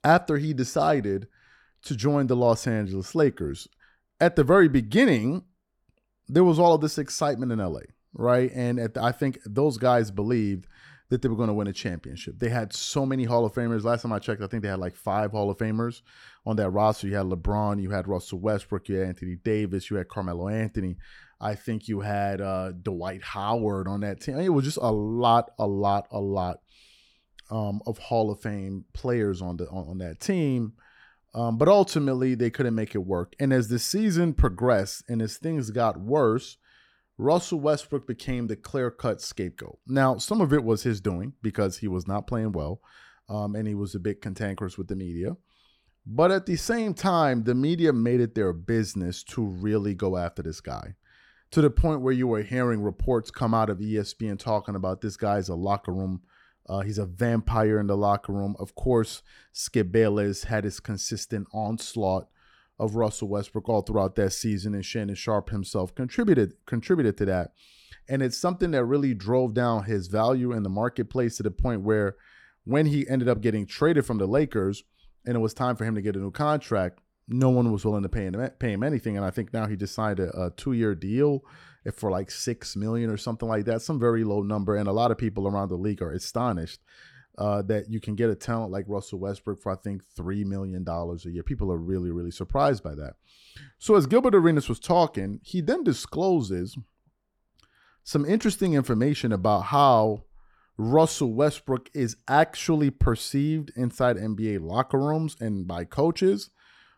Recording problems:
none

